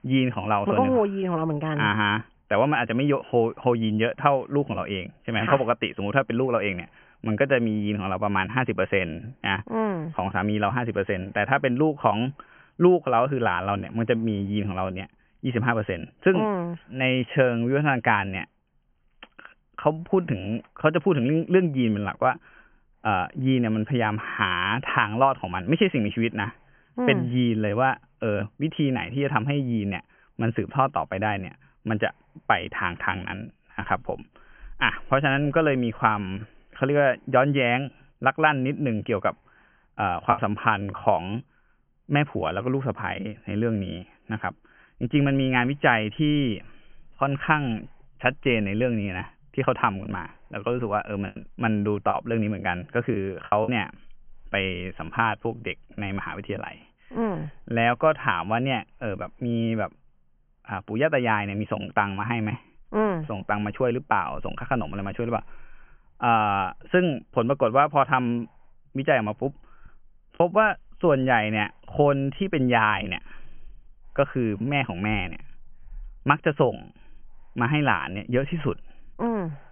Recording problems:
high frequencies cut off; severe; nothing above 3 kHz
choppy; very; at 40 s, from 51 to 54 s and at 1:10; 7% of the speech affected

